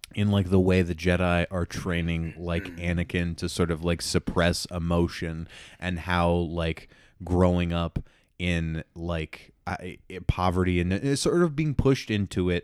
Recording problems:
none

